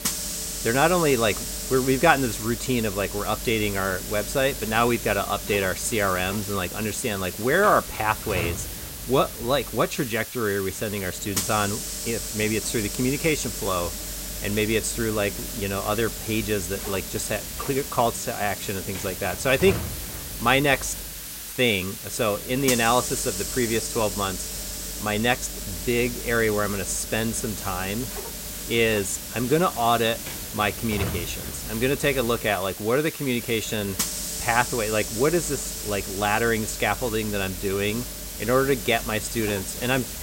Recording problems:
hiss; loud; throughout; 6 dB below the speech

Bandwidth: 16 kHz